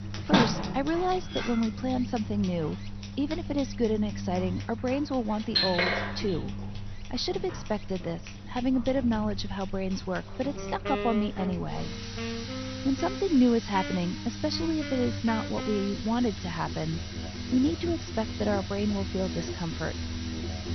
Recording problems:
garbled, watery; slightly; nothing above 6 kHz
household noises; loud; throughout; 7 dB below the speech
background music; loud; from 10 s on; 8 dB below the speech
low rumble; noticeable; throughout; 20 dB below the speech
rain or running water; faint; throughout; 25 dB below the speech

